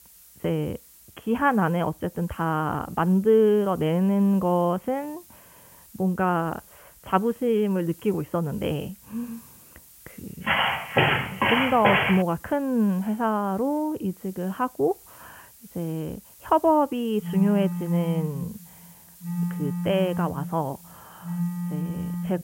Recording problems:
high frequencies cut off; severe; nothing above 3.5 kHz
hiss; faint; throughout; 25 dB below the speech
footsteps; loud; from 10 to 12 s; peak 4 dB above the speech
phone ringing; noticeable; from 17 s on; peak 3 dB below the speech

